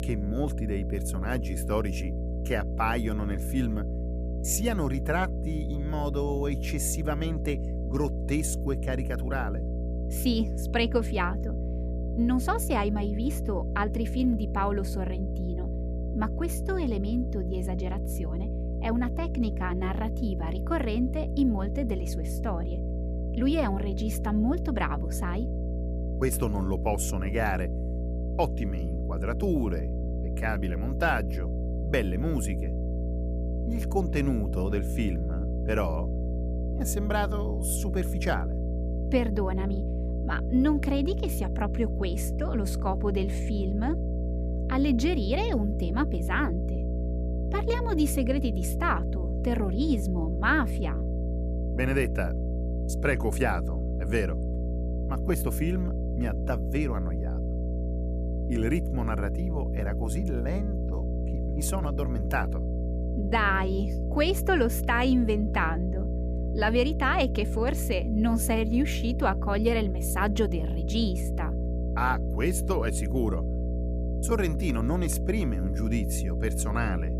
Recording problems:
electrical hum; loud; throughout; 60 Hz, 10 dB below the speech

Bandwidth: 14.5 kHz